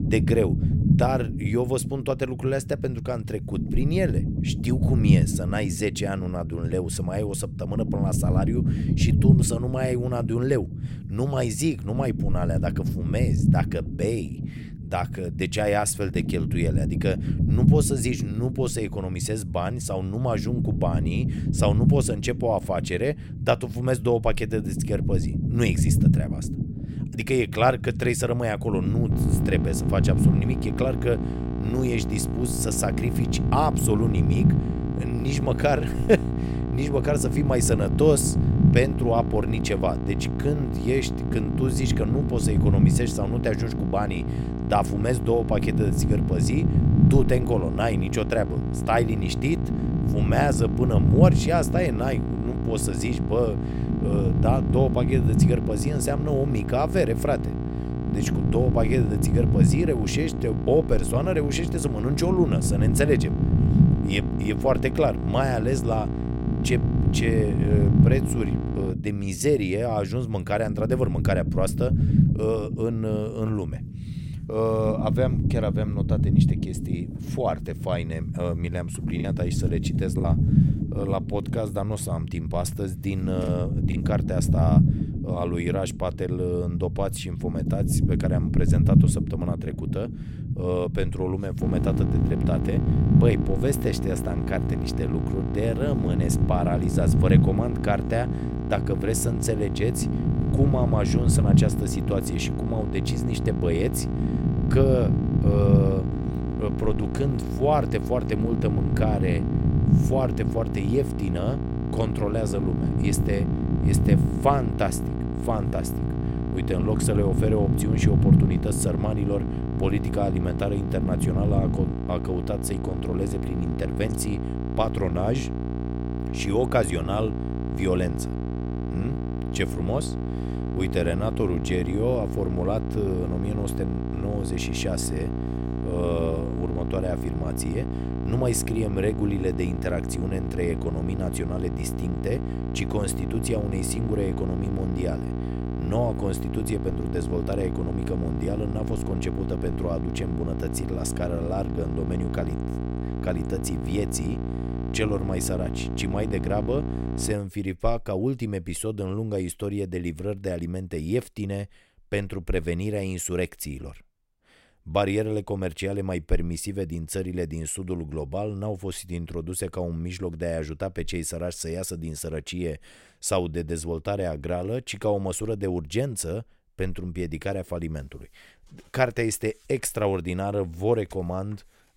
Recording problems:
electrical hum; loud; from 29 s to 1:09 and from 1:32 to 2:37; 60 Hz, 7 dB below the speech
low rumble; loud; until 2:02; 6 dB below the speech
choppy; occasionally; from 1:19 to 1:24; 4% of the speech affected

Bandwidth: 16 kHz